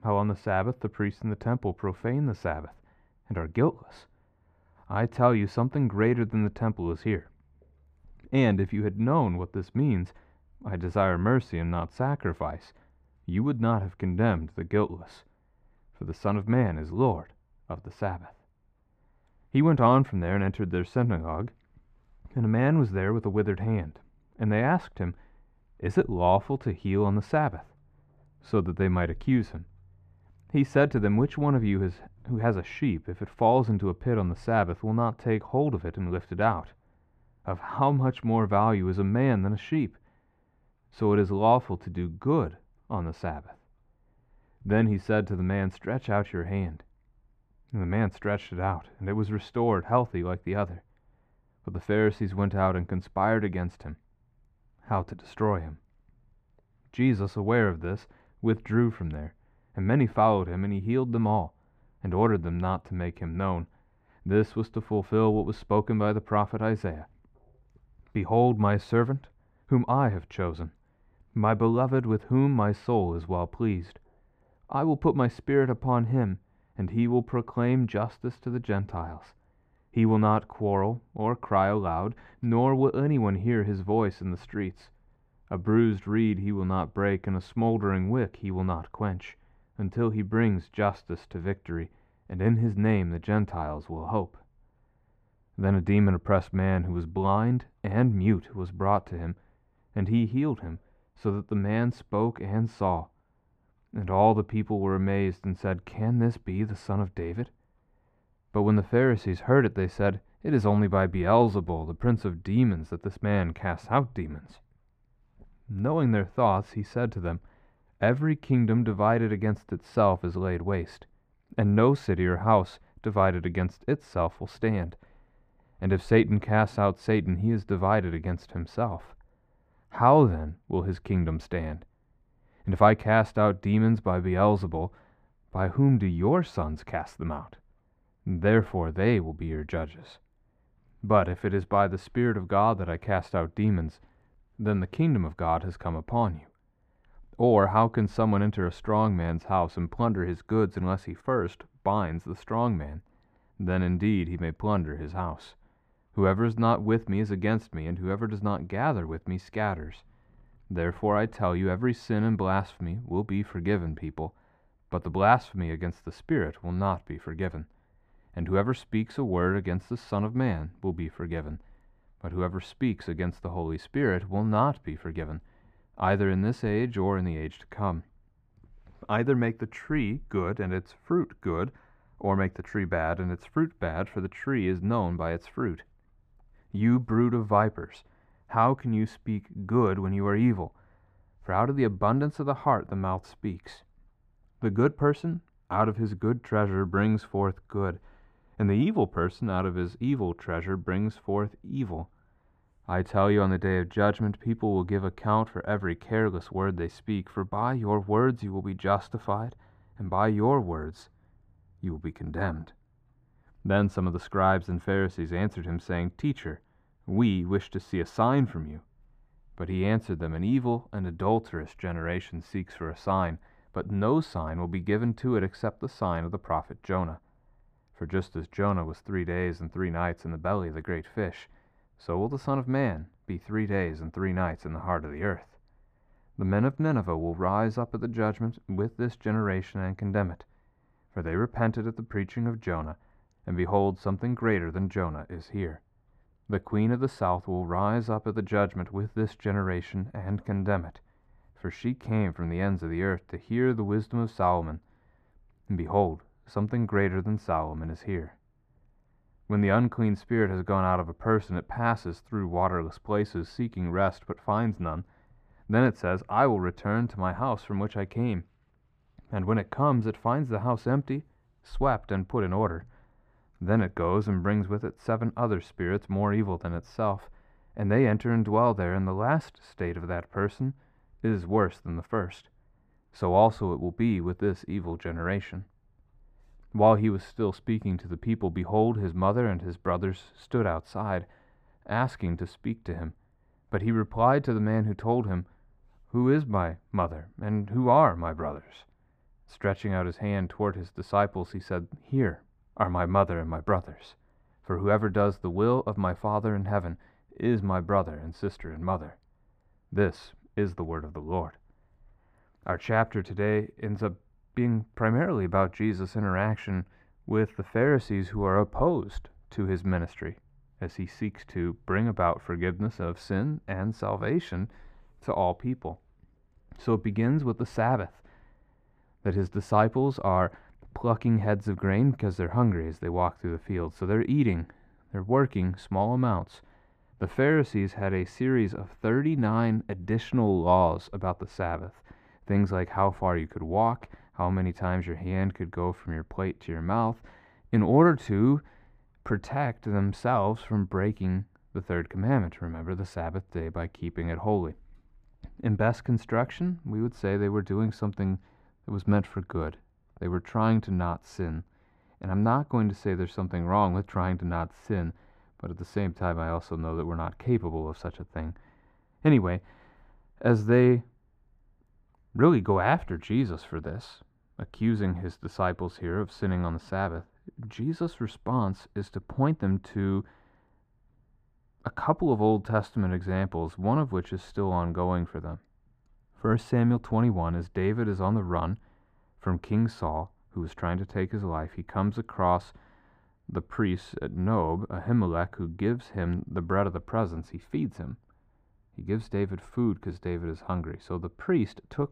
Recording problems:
muffled; very; fading above 3 kHz

